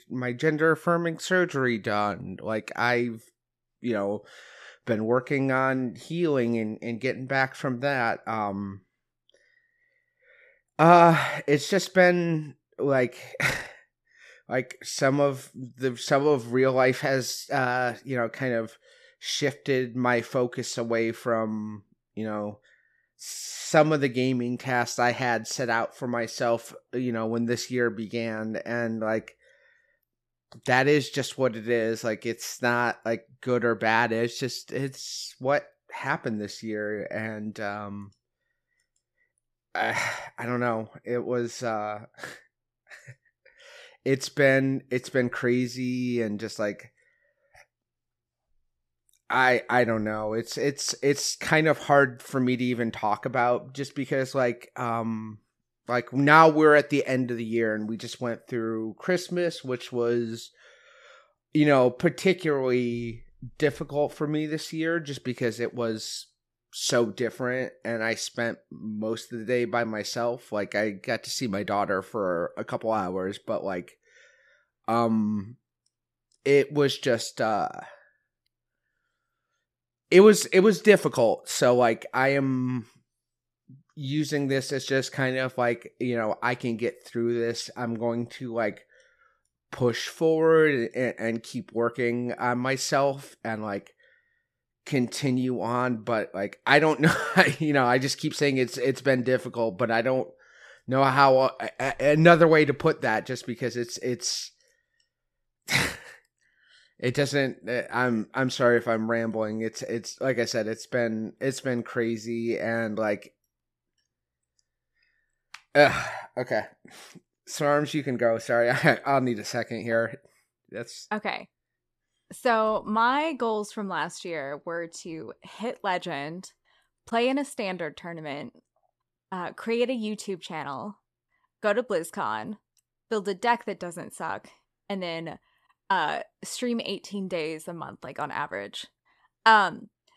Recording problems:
none

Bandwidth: 14 kHz